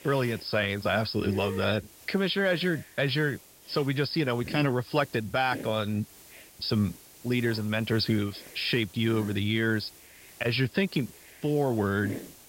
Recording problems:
high frequencies cut off; noticeable; nothing above 5.5 kHz
hiss; noticeable; throughout; 15 dB below the speech

